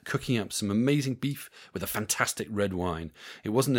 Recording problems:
abrupt cut into speech; at the end

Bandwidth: 16.5 kHz